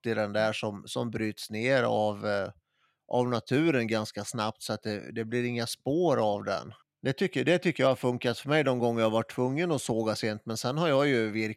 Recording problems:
none

